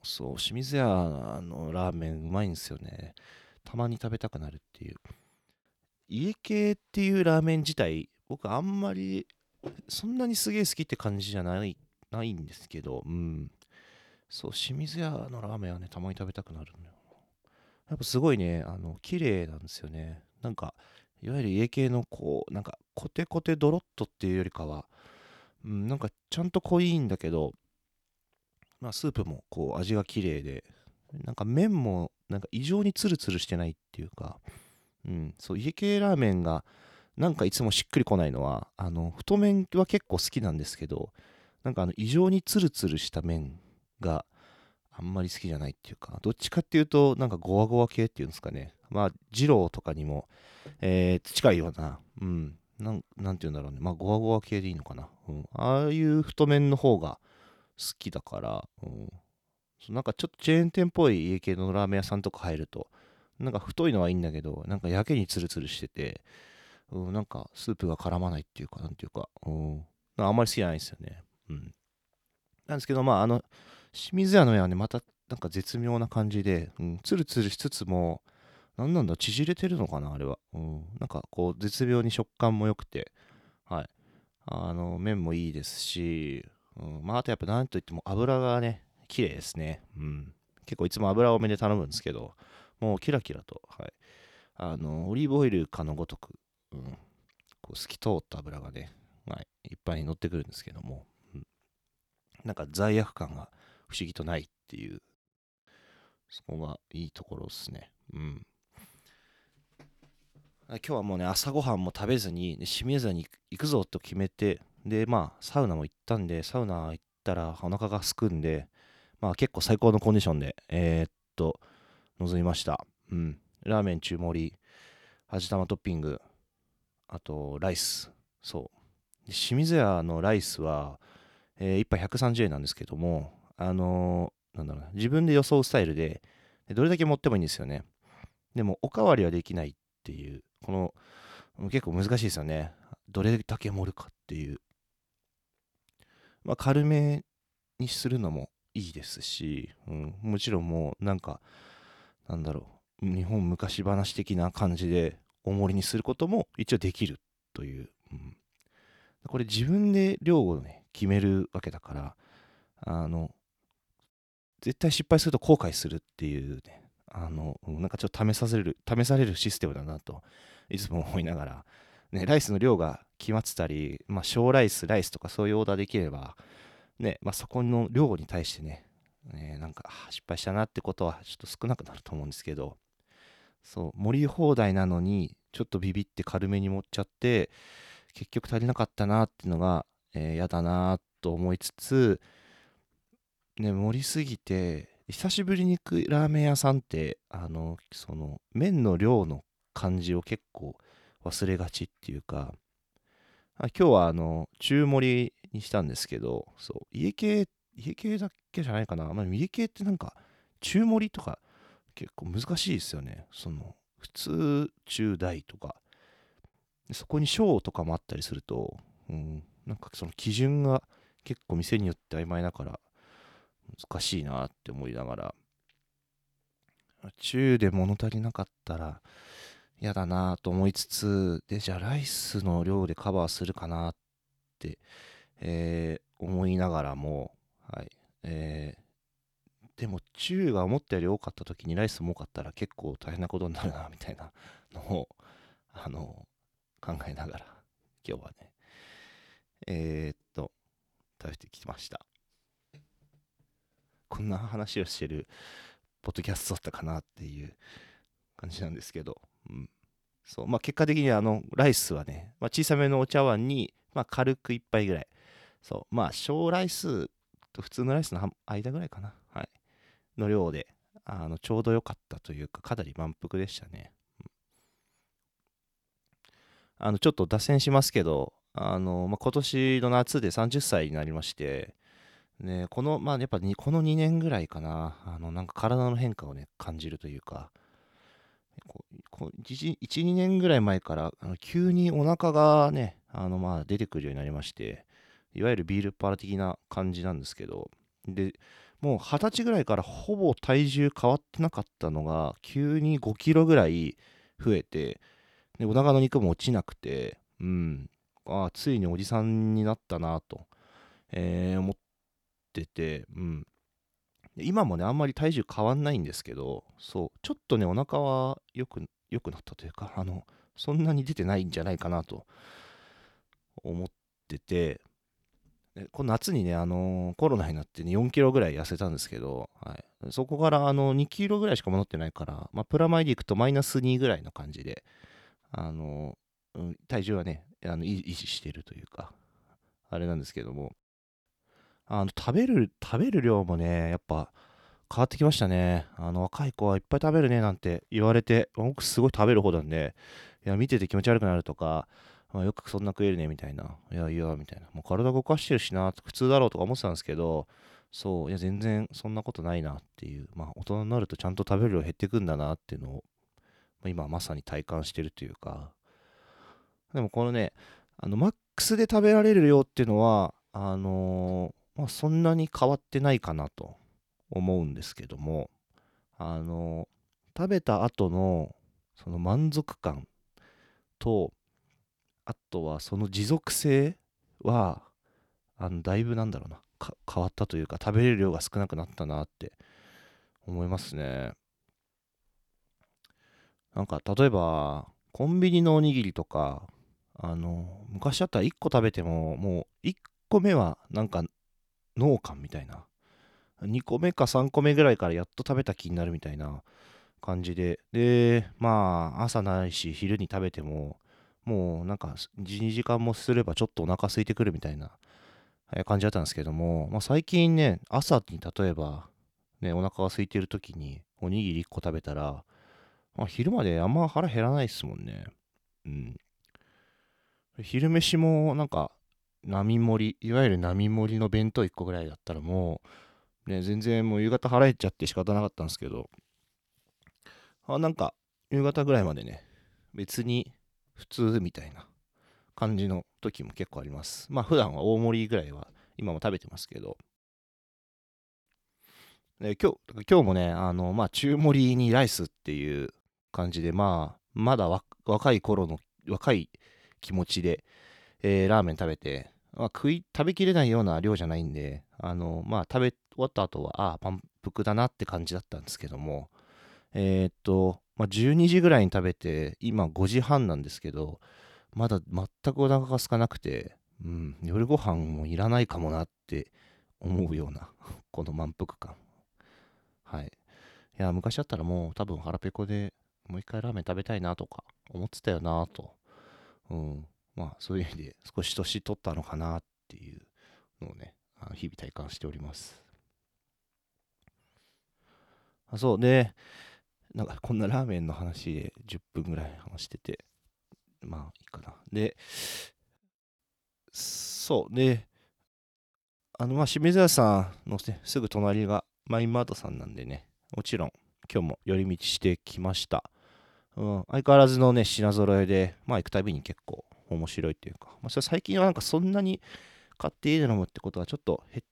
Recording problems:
none

